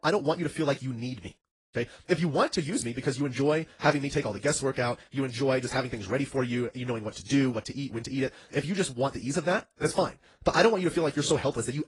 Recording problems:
wrong speed, natural pitch; too fast; 1.5 times normal speed
garbled, watery; slightly

